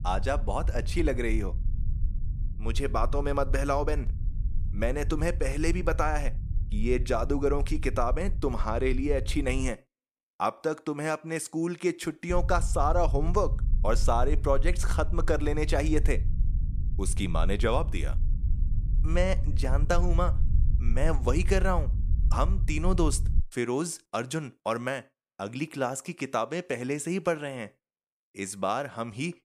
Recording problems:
low rumble; noticeable; until 9.5 s and from 12 to 23 s; 20 dB below the speech

